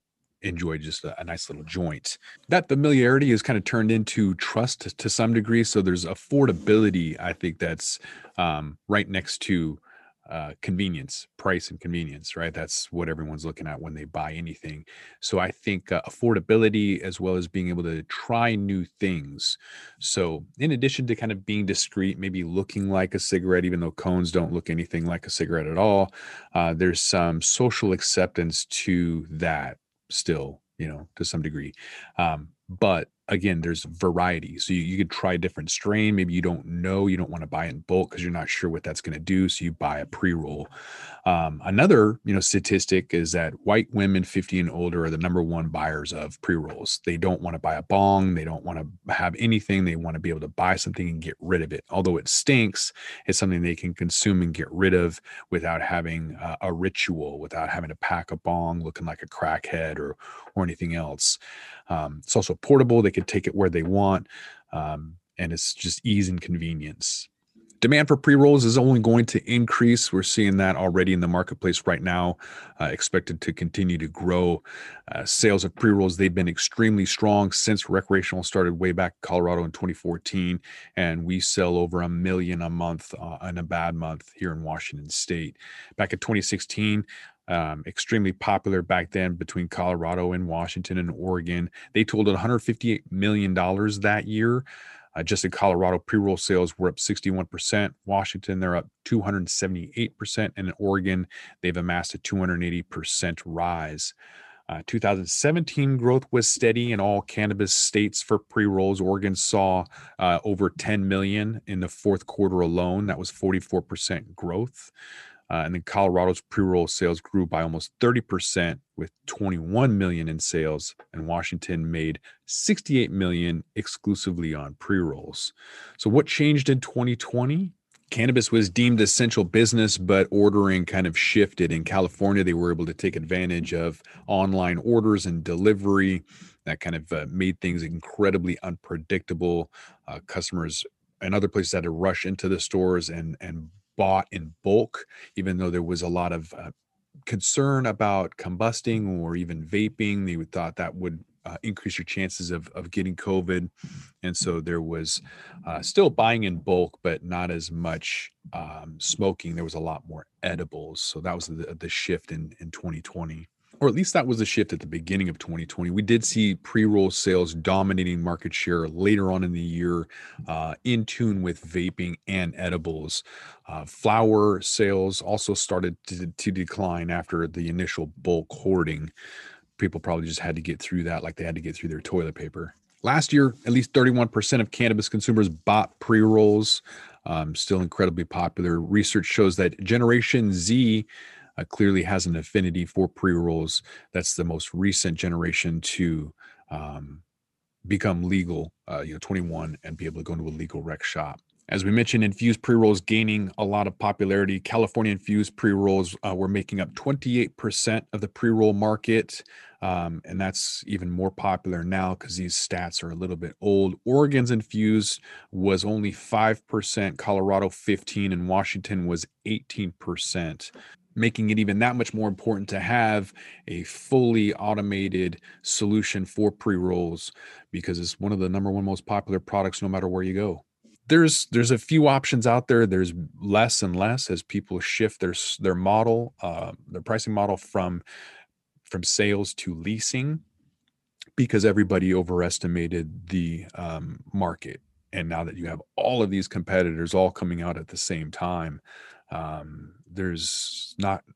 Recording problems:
none

